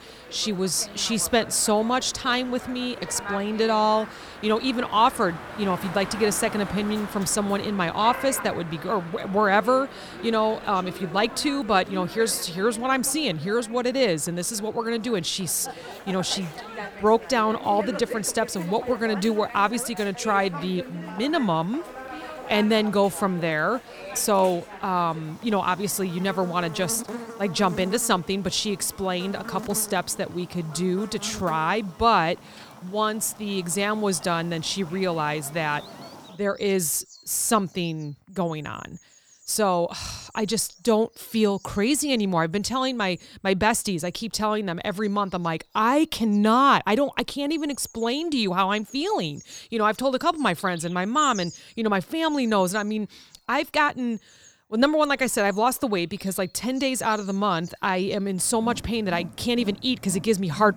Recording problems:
animal sounds; noticeable; throughout; 15 dB below the speech

